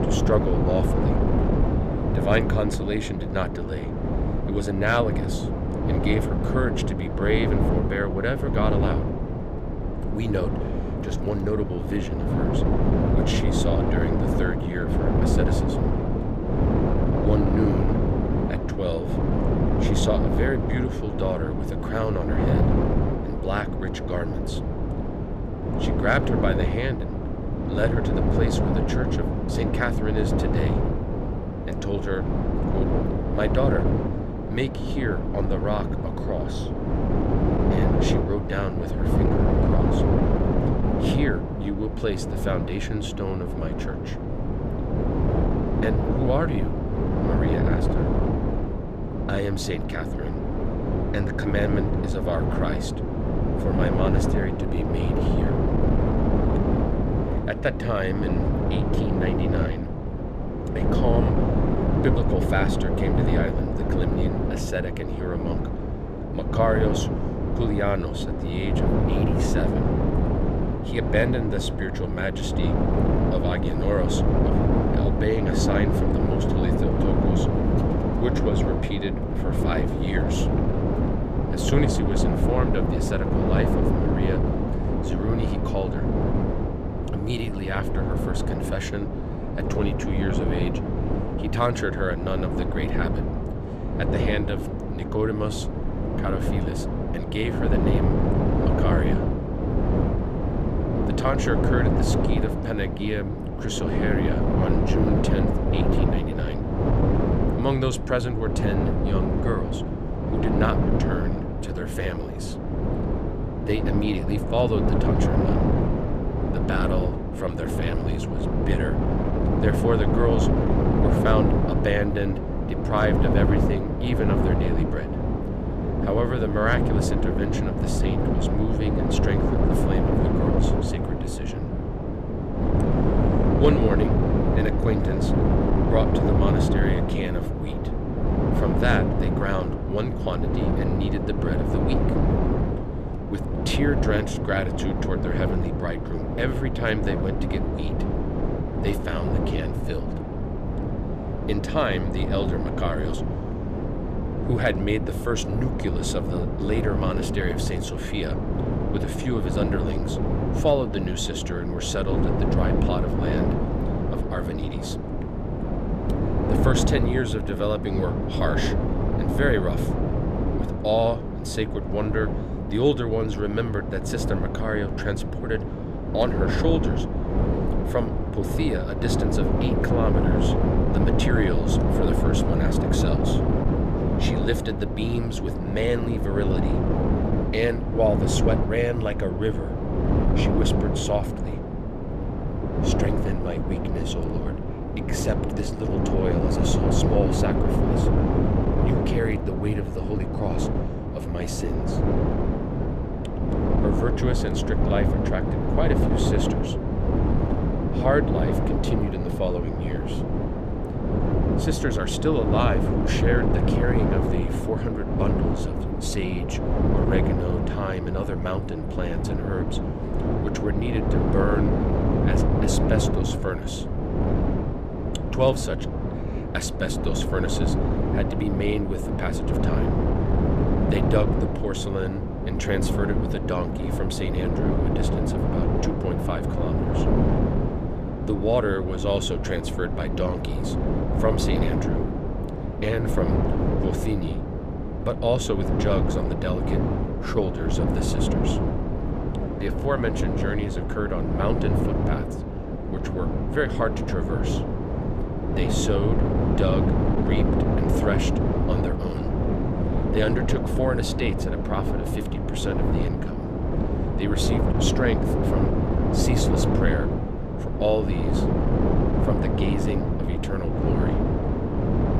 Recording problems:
wind noise on the microphone; heavy; as loud as the speech

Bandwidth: 14.5 kHz